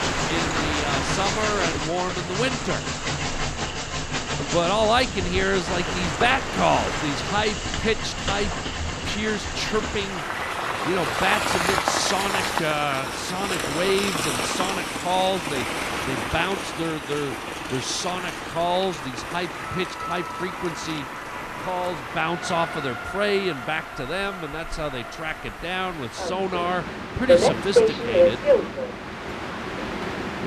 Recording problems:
train or aircraft noise; very loud; throughout; as loud as the speech

